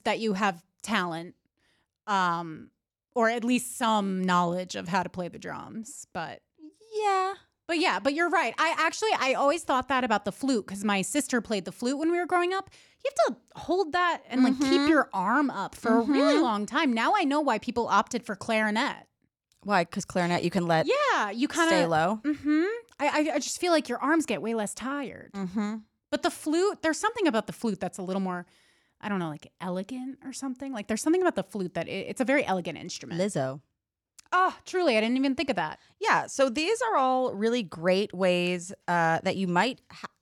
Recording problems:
none

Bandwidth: 18 kHz